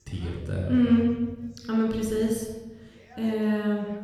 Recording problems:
room echo; noticeable; dies away in 1.3 s
off-mic speech; somewhat distant
voice in the background; faint; throughout; 30 dB below the speech

